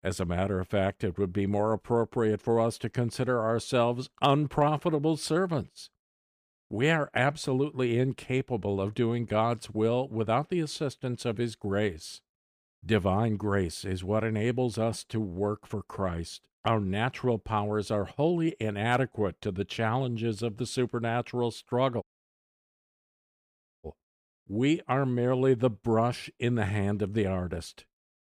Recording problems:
audio cutting out; at 22 s for 2 s

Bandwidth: 15 kHz